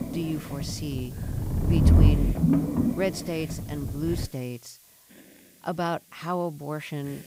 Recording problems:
low rumble; loud; until 4.5 s; 1 dB below the speech
hiss; noticeable; throughout; 15 dB below the speech

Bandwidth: 15.5 kHz